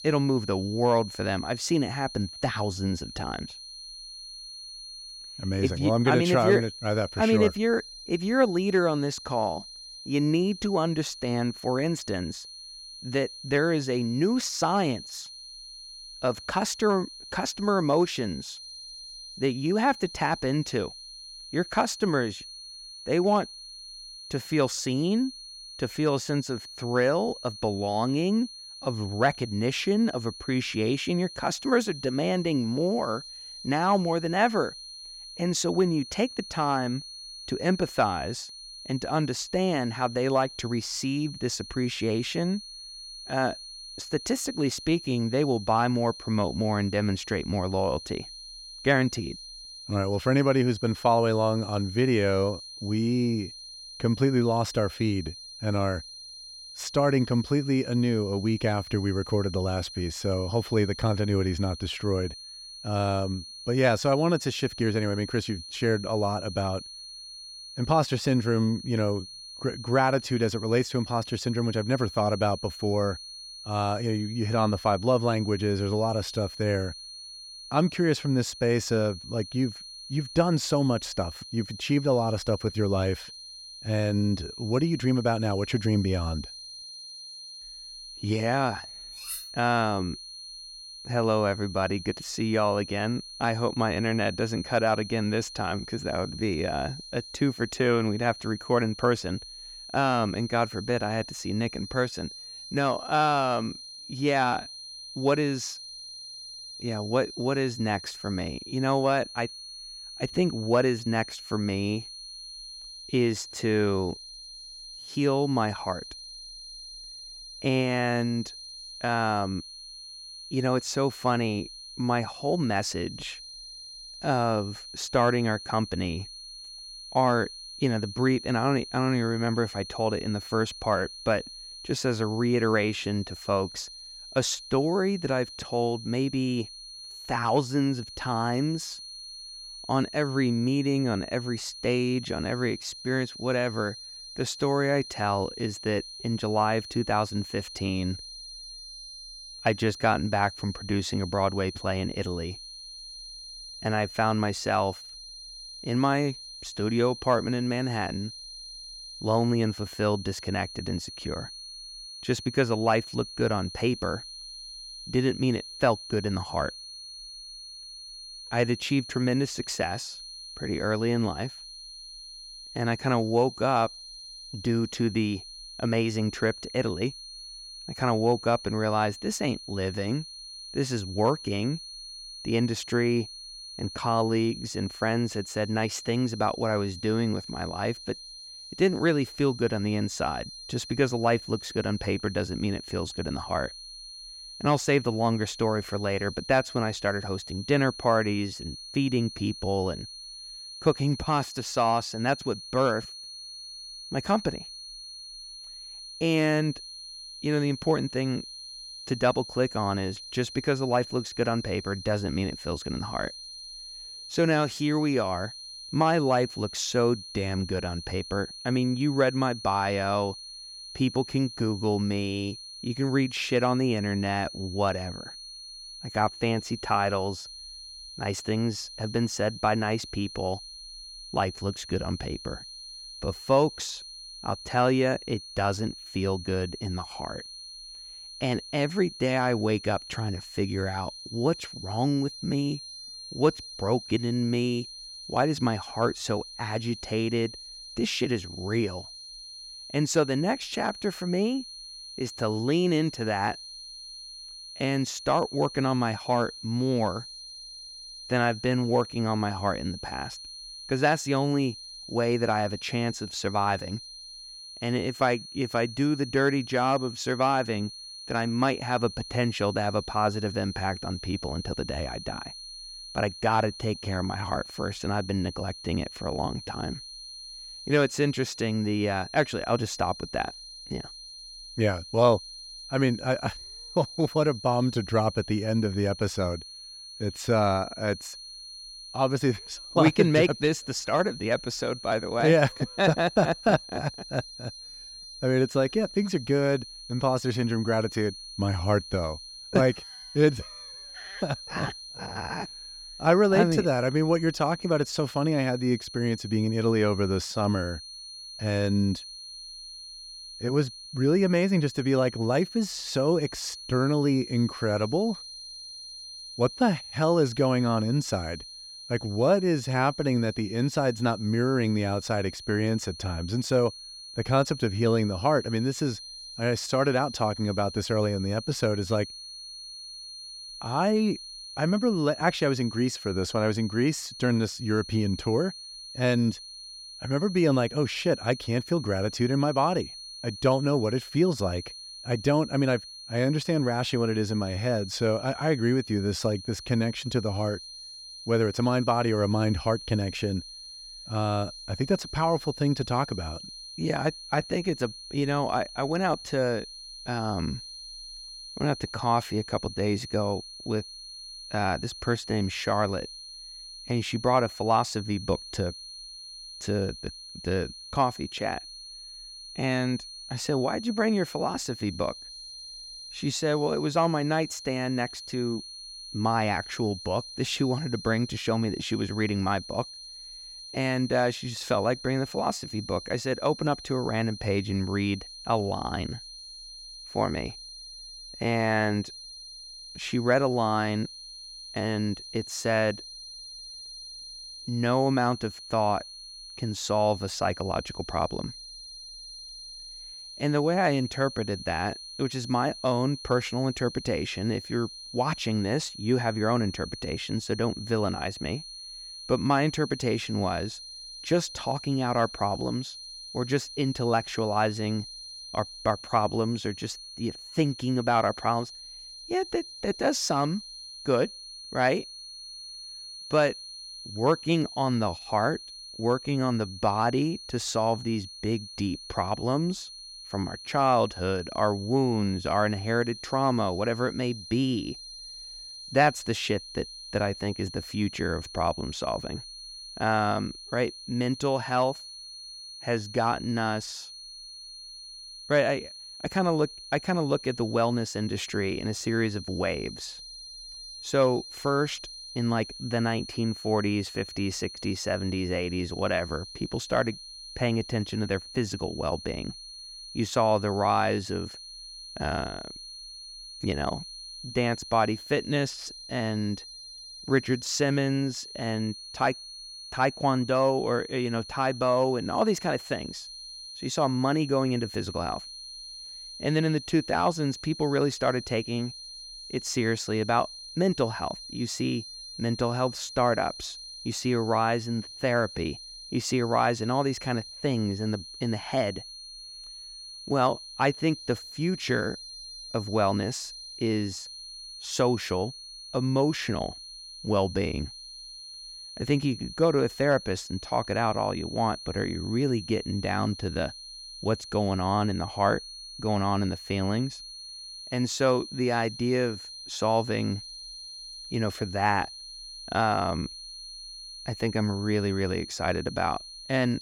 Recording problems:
high-pitched whine; noticeable; throughout; 4.5 kHz, 10 dB below the speech
clattering dishes; noticeable; at 1:29; peak 9 dB below the speech

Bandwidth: 16 kHz